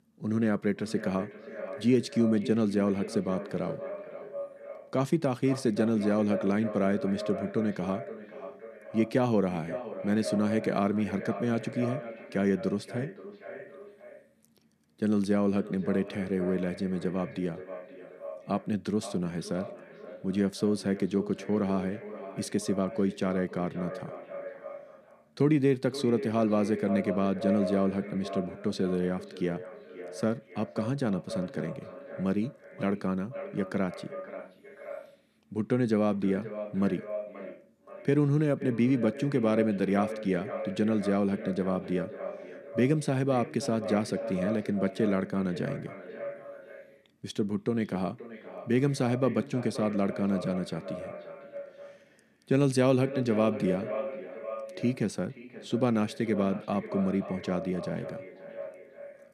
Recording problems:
echo of what is said; strong; throughout; 530 ms later, 10 dB below the speech

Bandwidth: 14 kHz